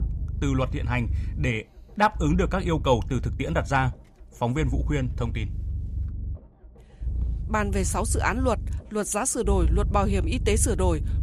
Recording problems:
low rumble; faint; throughout; 20 dB below the speech

